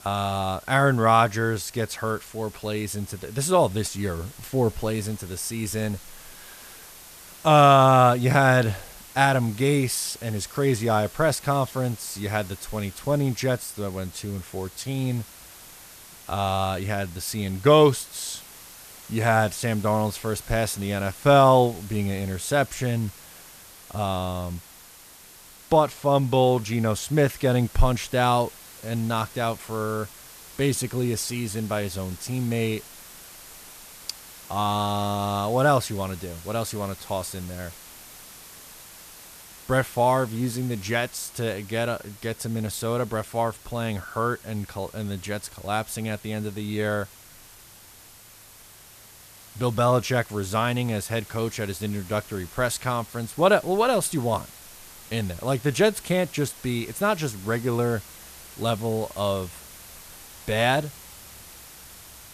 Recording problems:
hiss; noticeable; throughout; 20 dB below the speech

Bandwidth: 14.5 kHz